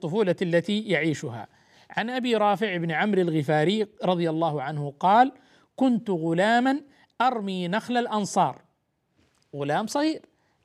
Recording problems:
none

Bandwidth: 15 kHz